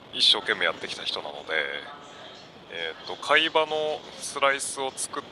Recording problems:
thin; very; fading below 750 Hz
wind noise on the microphone; occasional gusts; 20 dB below the speech
background chatter; faint; throughout; 4 voices, 20 dB below the speech

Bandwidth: 15.5 kHz